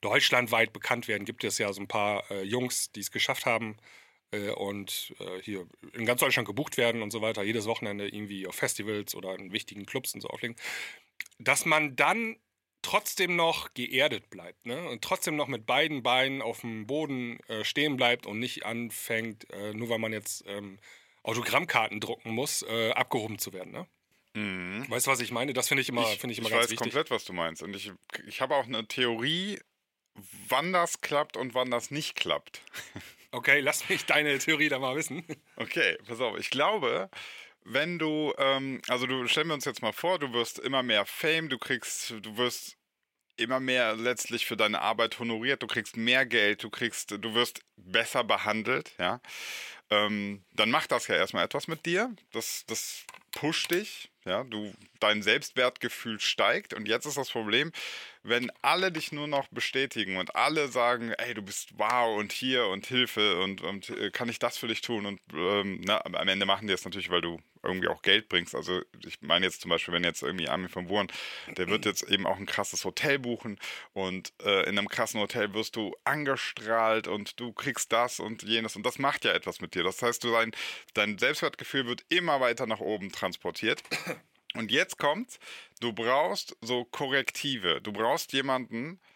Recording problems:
thin; very slightly; fading below 400 Hz

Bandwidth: 16.5 kHz